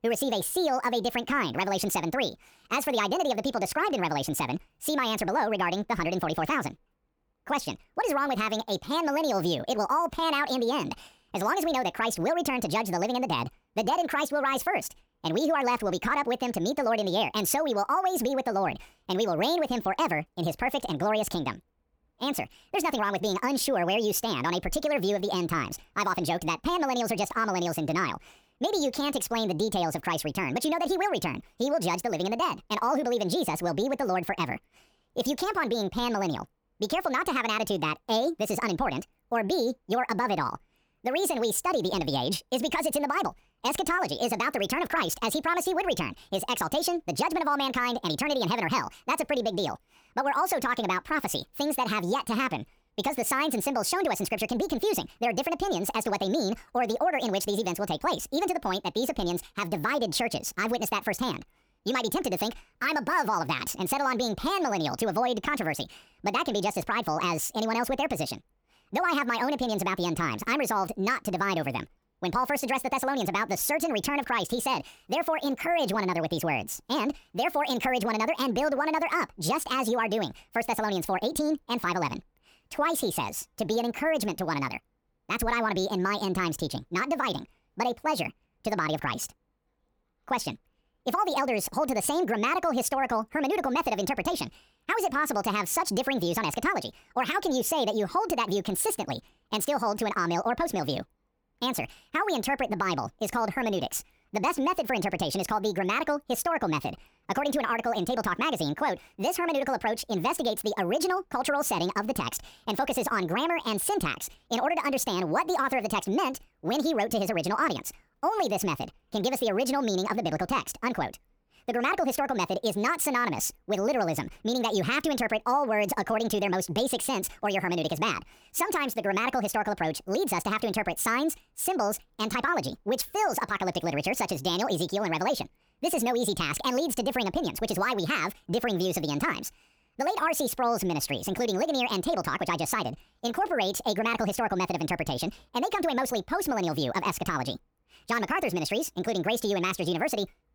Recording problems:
wrong speed and pitch; too fast and too high; 1.6 times normal speed

